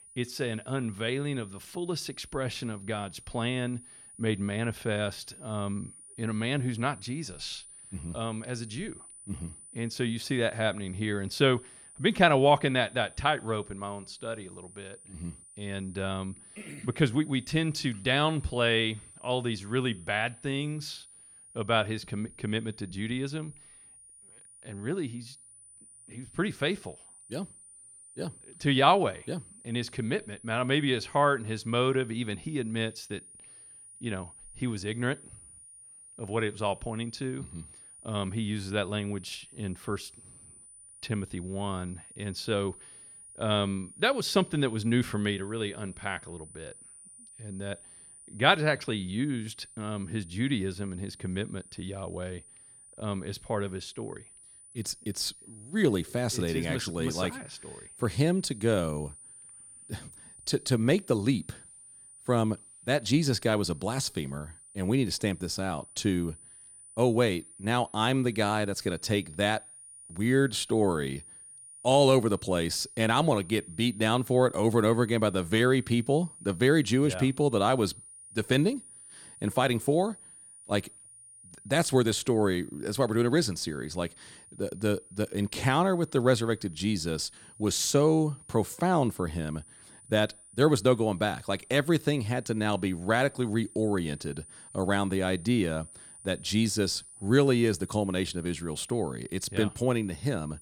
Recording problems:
high-pitched whine; noticeable; throughout; 9.5 kHz, 20 dB below the speech

